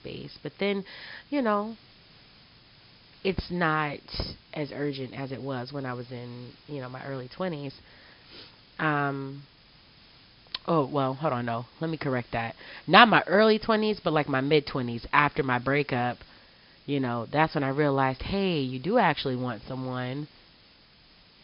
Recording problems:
high frequencies cut off; noticeable; nothing above 5.5 kHz
hiss; faint; throughout; 25 dB below the speech

